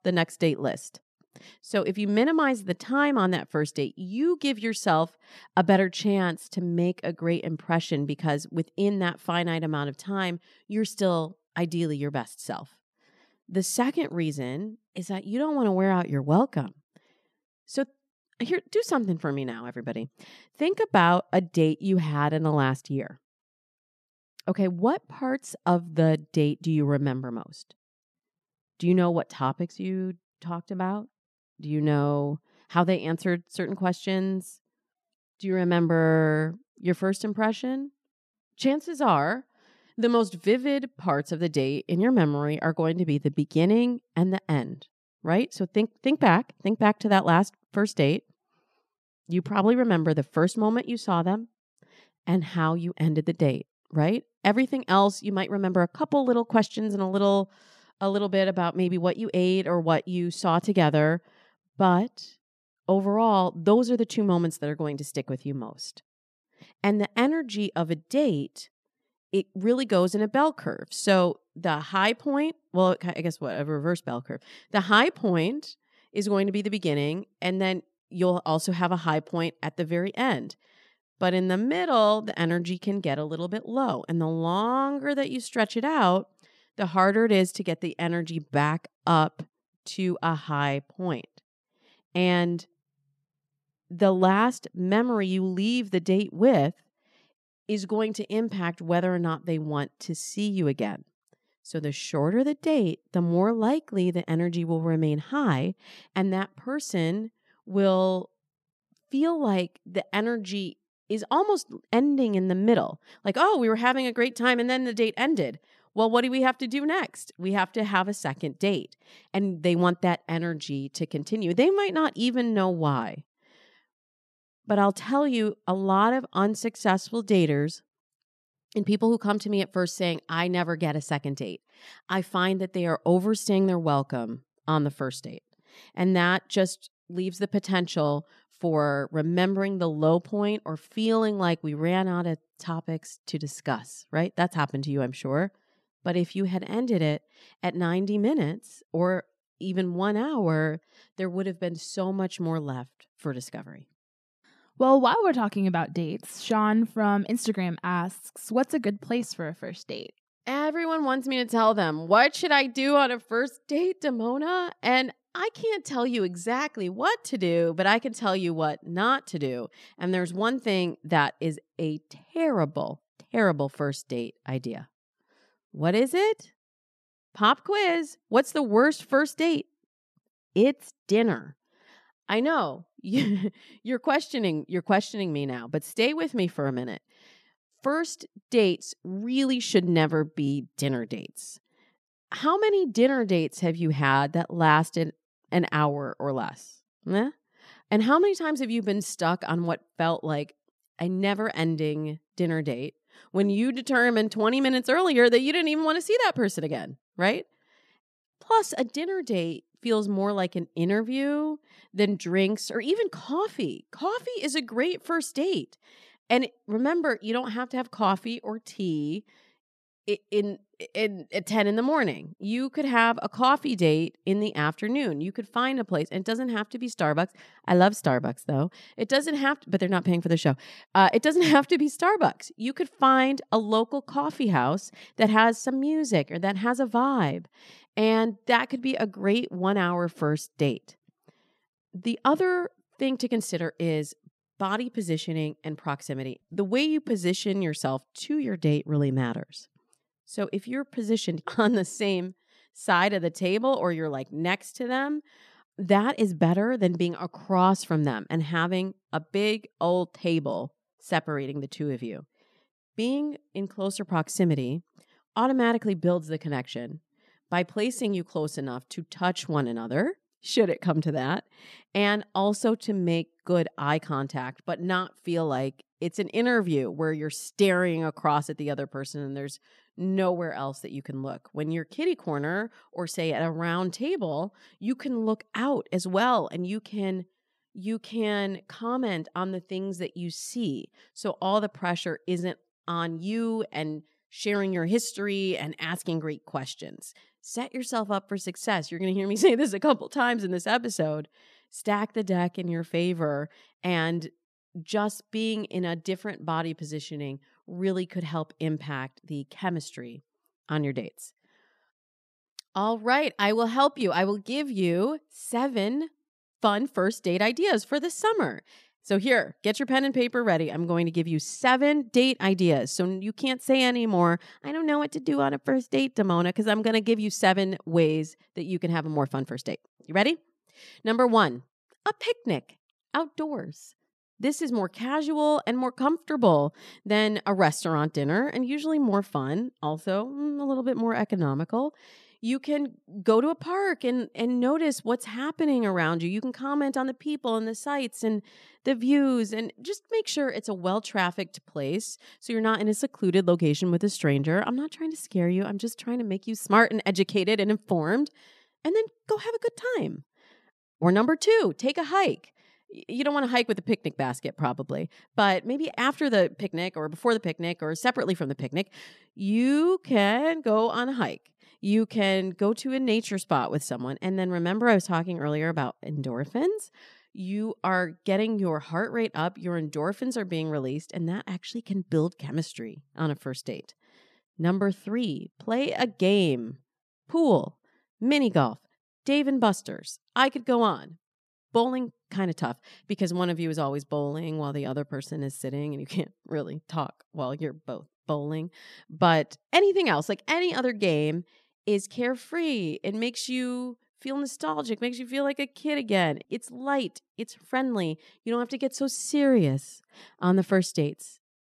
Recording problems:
none

